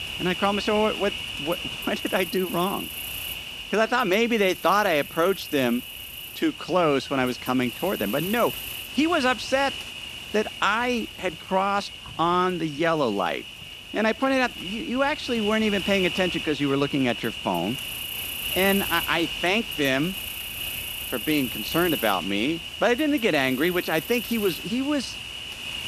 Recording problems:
animal sounds; loud; throughout; 7 dB below the speech

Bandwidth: 14.5 kHz